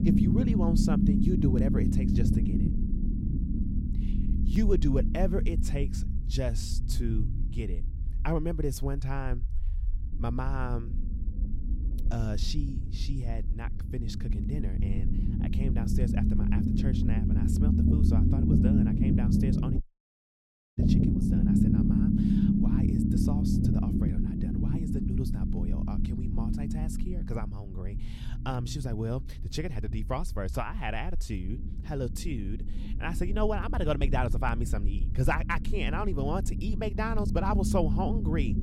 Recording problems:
low rumble; loud; throughout; as loud as the speech
audio cutting out; at 20 s for 1 s

